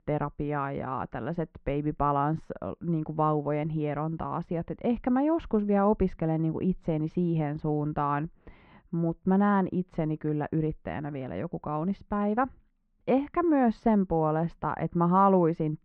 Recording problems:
muffled; very; fading above 2 kHz

